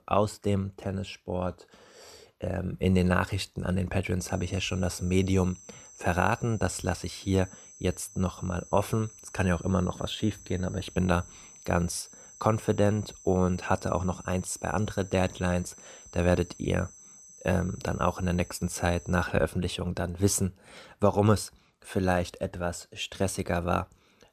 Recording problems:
high-pitched whine; noticeable; from 4 to 19 s; 6 kHz, 20 dB below the speech

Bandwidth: 14.5 kHz